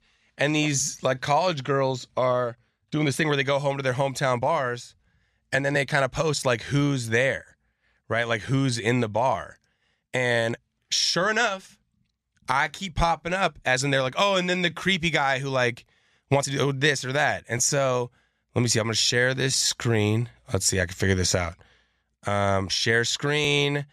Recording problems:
uneven, jittery; strongly; from 0.5 to 20 s

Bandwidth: 14.5 kHz